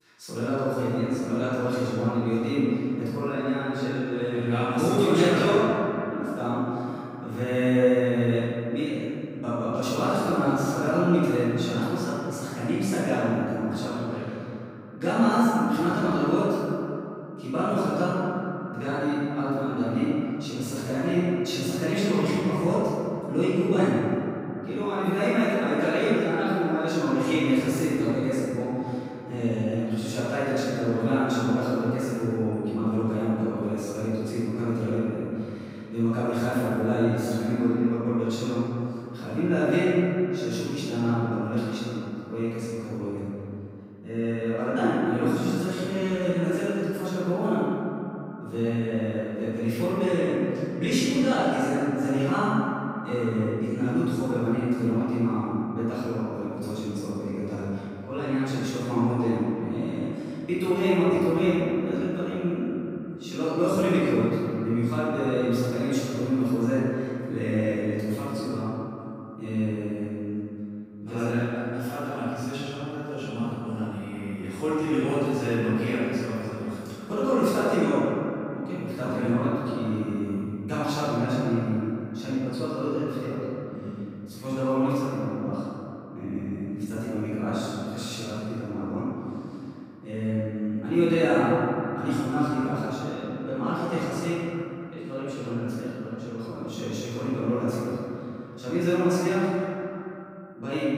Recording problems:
room echo; strong; dies away in 2.6 s
off-mic speech; far
echo of what is said; faint; throughout; 240 ms later, 20 dB below the speech

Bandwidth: 15.5 kHz